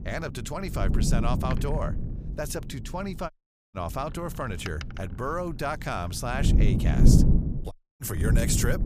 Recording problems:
wind noise on the microphone; heavy; 3 dB below the speech
door banging; noticeable; from 1.5 to 8 s; peak 8 dB below the speech
audio cutting out; at 3.5 s and at 7.5 s

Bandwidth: 15 kHz